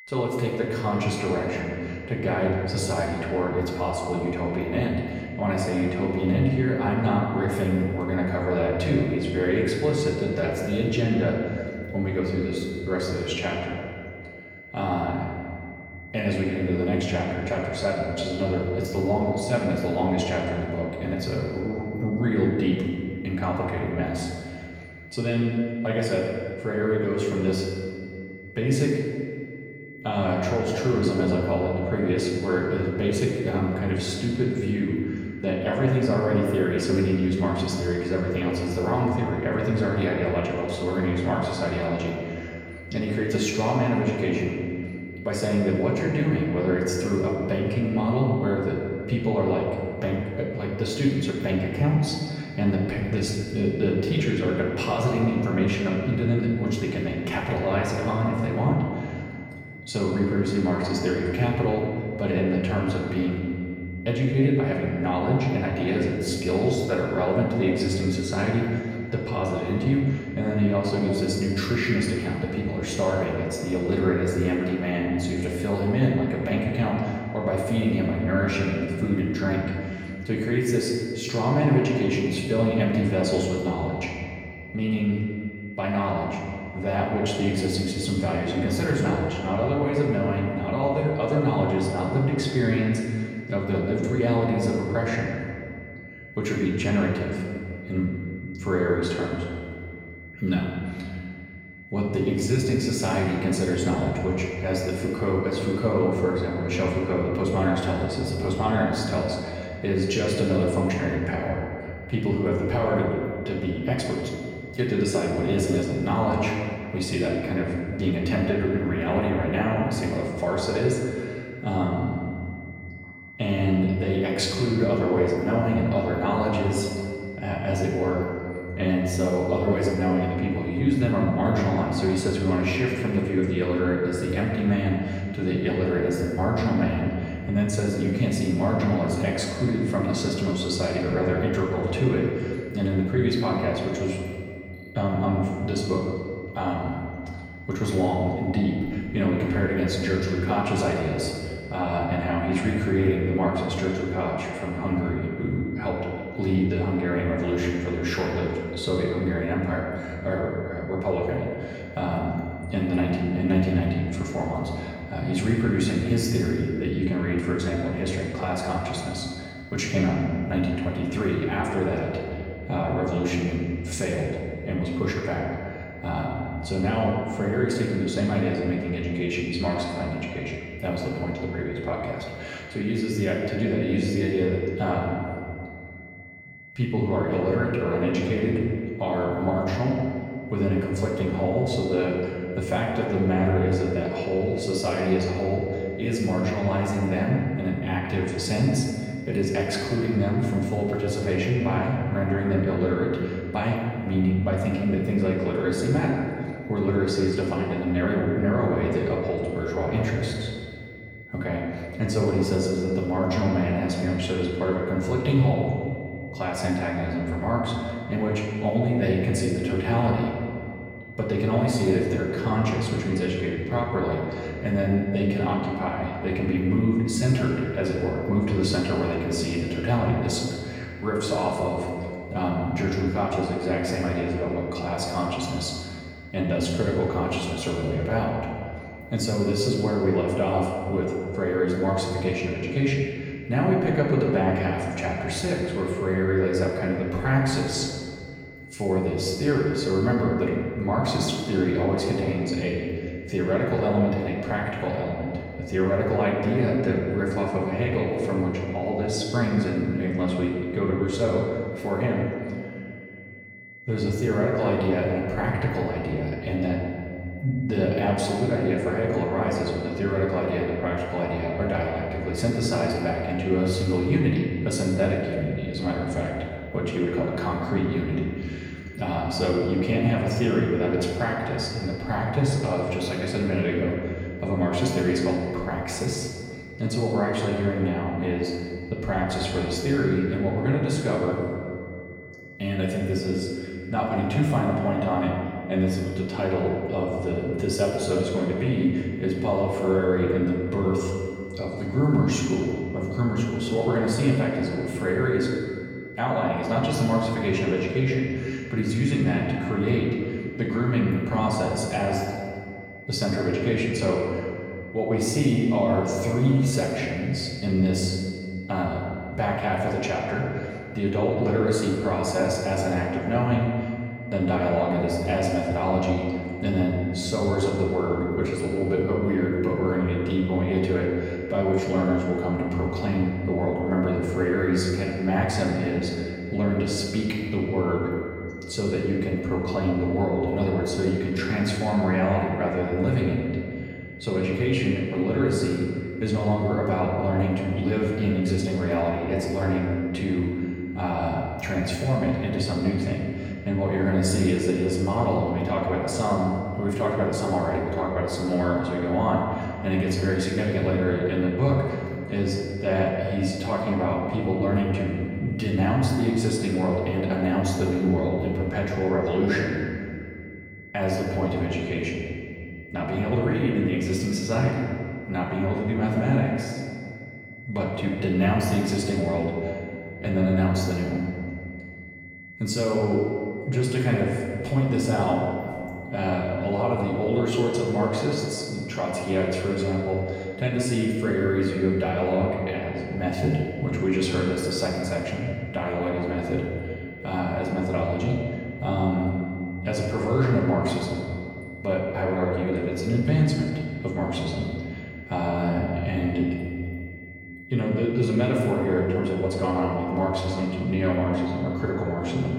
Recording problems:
off-mic speech; far
room echo; noticeable; dies away in 2 s
high-pitched whine; noticeable; throughout; 2 kHz, 20 dB below the speech

